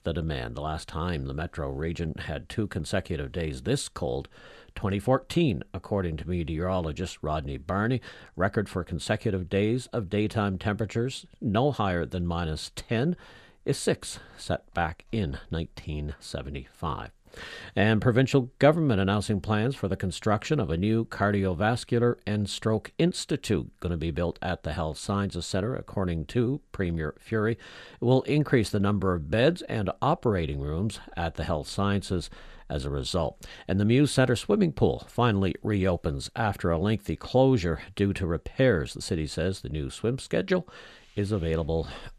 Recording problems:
none

